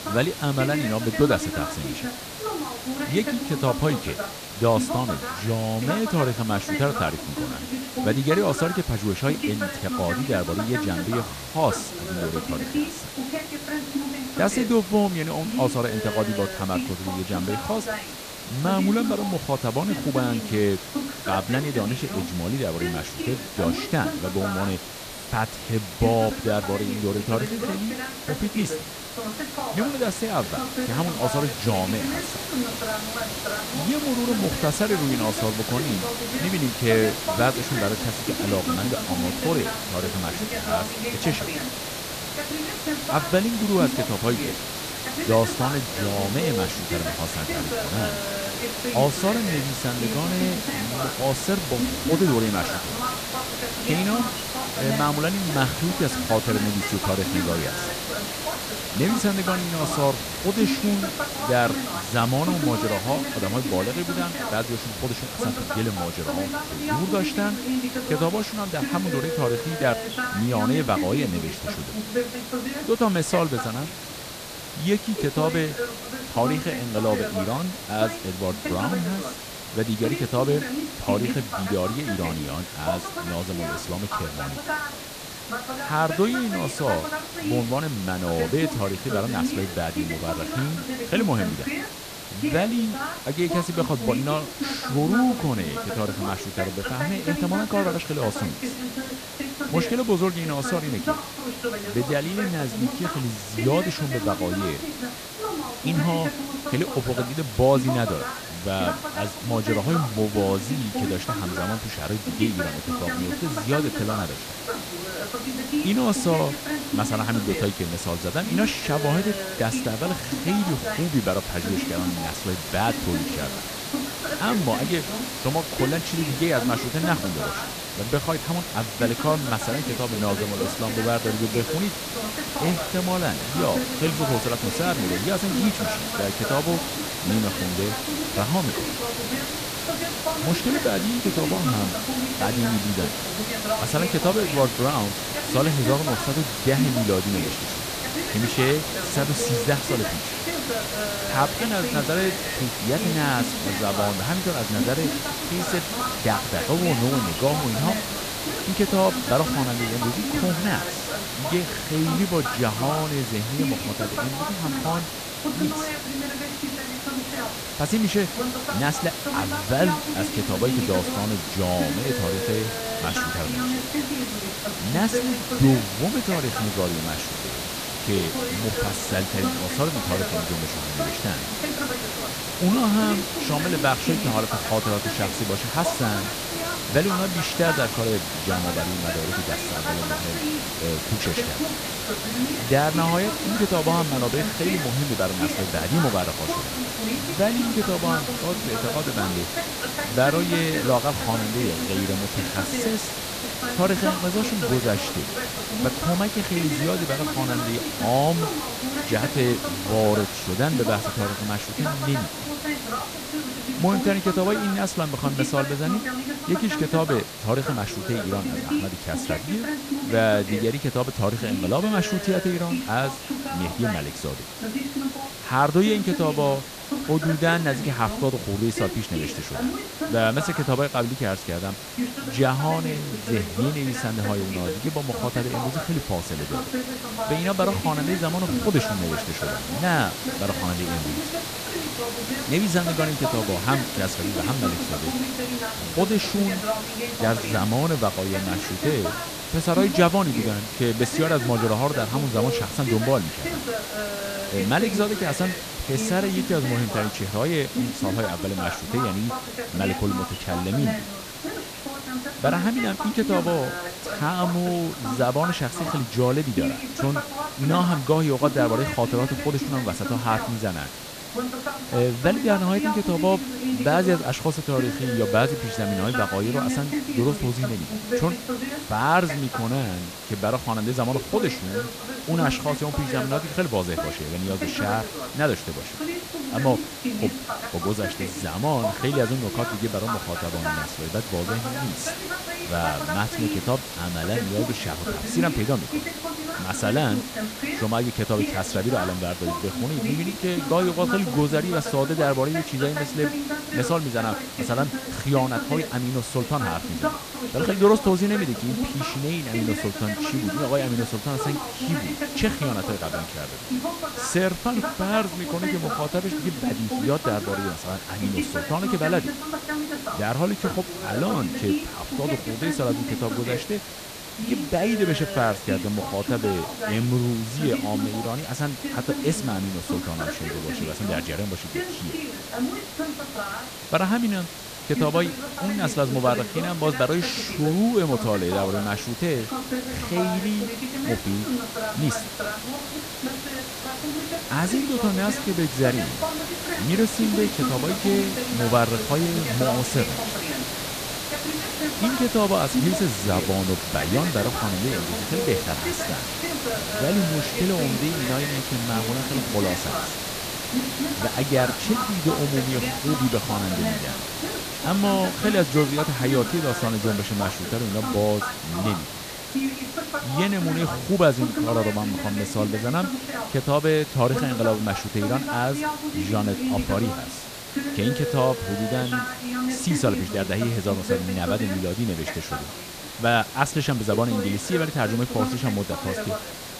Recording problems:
voice in the background; loud; throughout; 6 dB below the speech
hiss; loud; throughout; 6 dB below the speech
high-pitched whine; faint; throughout; 2.5 kHz, 30 dB below the speech

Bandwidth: 14.5 kHz